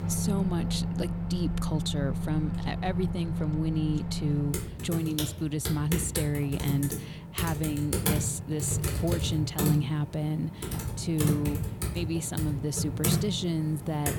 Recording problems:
household noises; loud; throughout; 1 dB below the speech

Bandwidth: 18 kHz